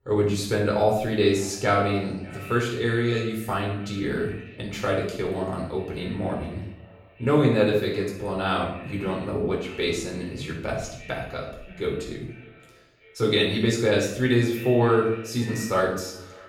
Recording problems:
off-mic speech; far
room echo; noticeable; dies away in 0.6 s
echo of what is said; faint; throughout; 590 ms later, 20 dB below the speech

